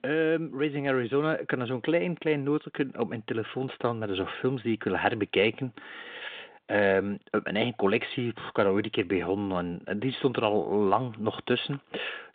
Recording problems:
phone-call audio; nothing above 3.5 kHz

